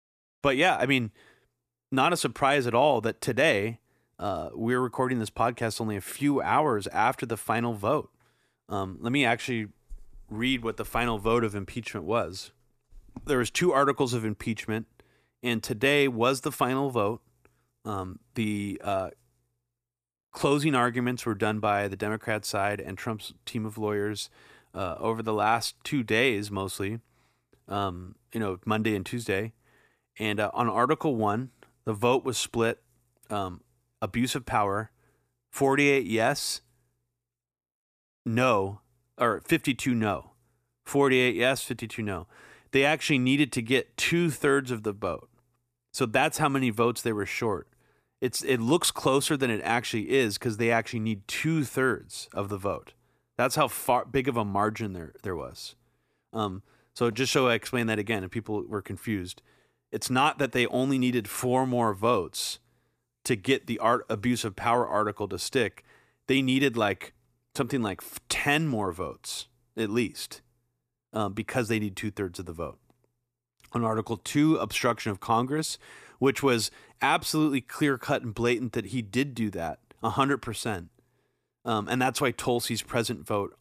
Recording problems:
none

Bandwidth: 14.5 kHz